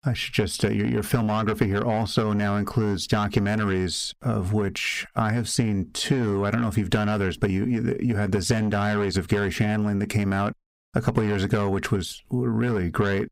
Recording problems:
distortion; slight; 10 dB below the speech
squashed, flat; somewhat

